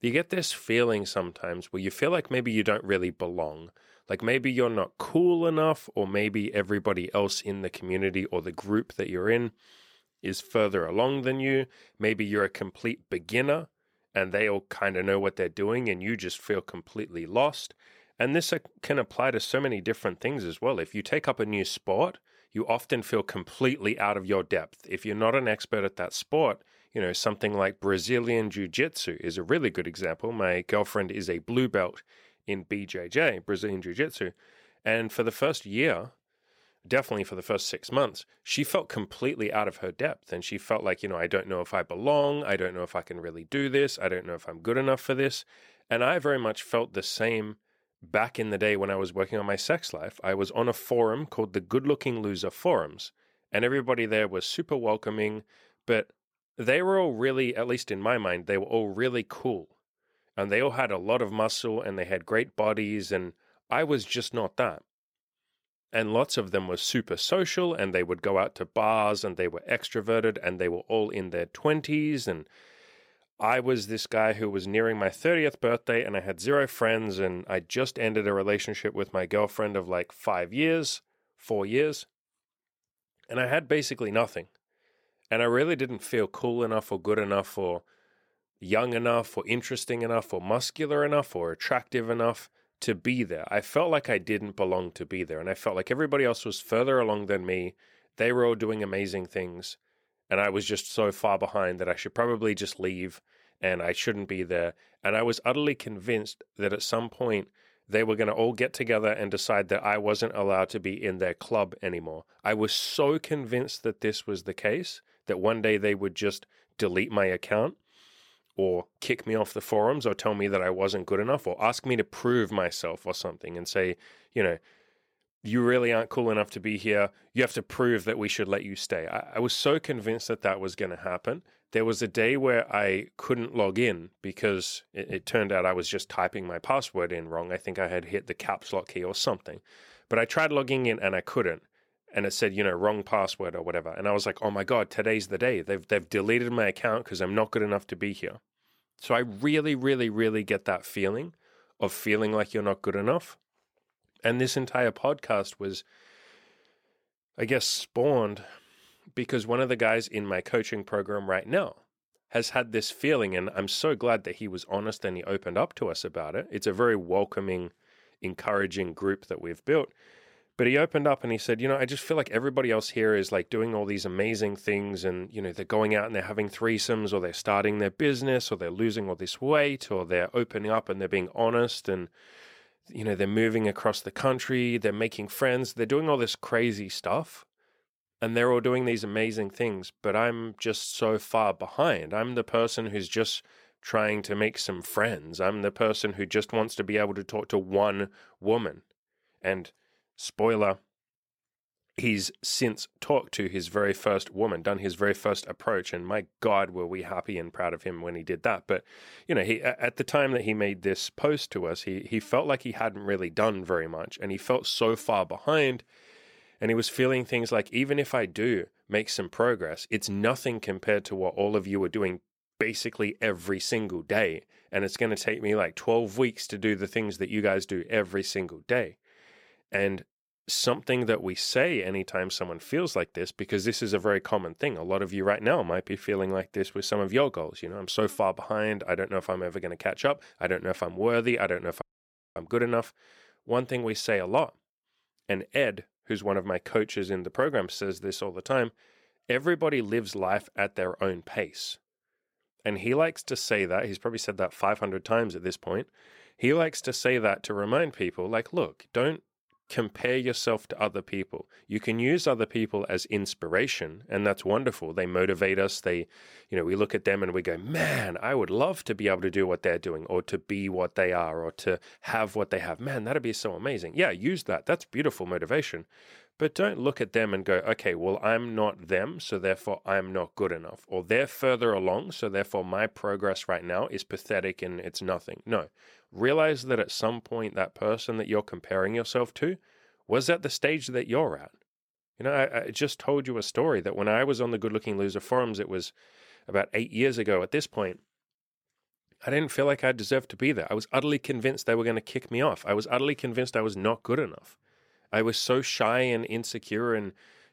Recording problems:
audio cutting out; at 4:02 for 0.5 s

